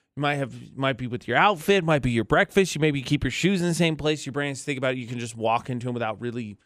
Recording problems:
none

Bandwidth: 14.5 kHz